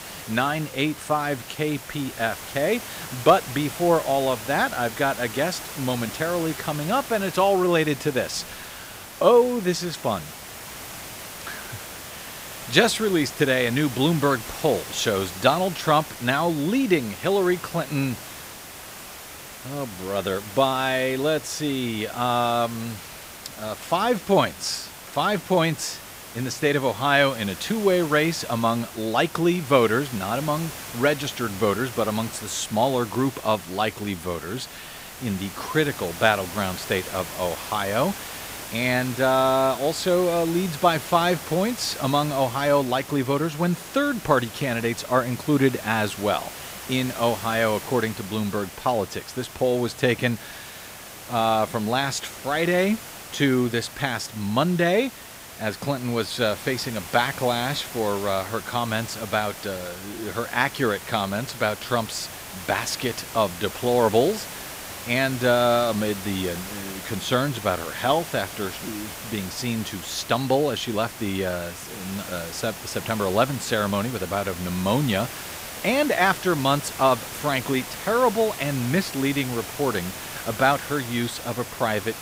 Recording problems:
hiss; noticeable; throughout; 10 dB below the speech

